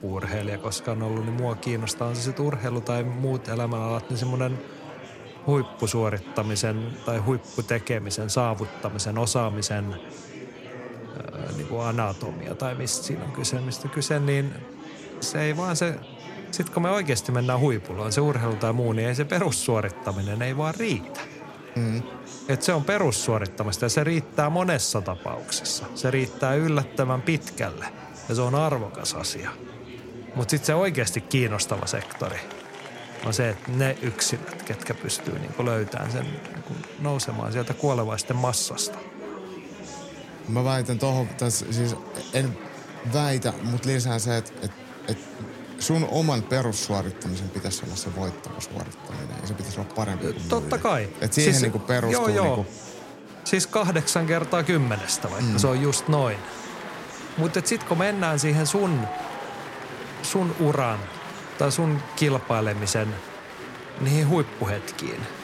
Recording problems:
murmuring crowd; noticeable; throughout; 15 dB below the speech

